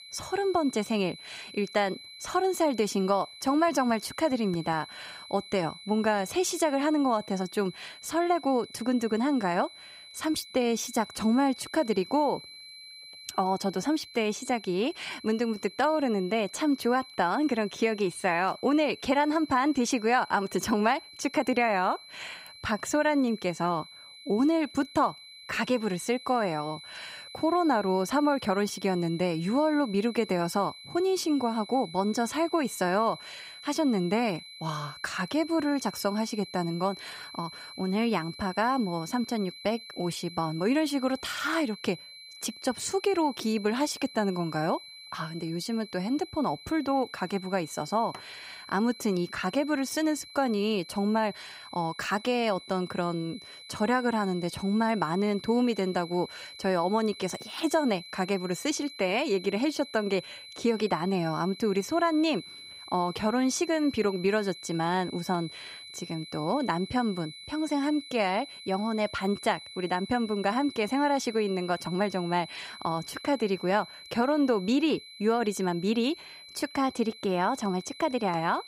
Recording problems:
high-pitched whine; noticeable; throughout; 4 kHz, 15 dB below the speech

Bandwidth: 15.5 kHz